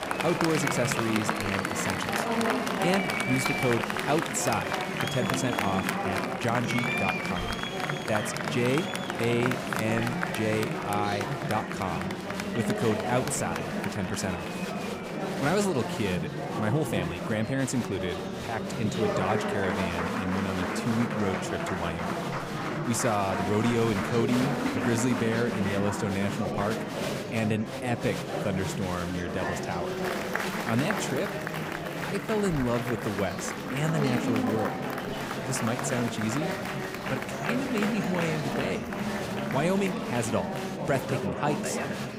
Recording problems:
murmuring crowd; loud; throughout; as loud as the speech

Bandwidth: 15.5 kHz